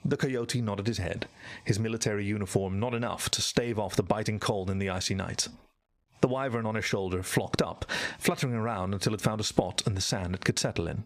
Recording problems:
squashed, flat; heavily

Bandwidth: 15 kHz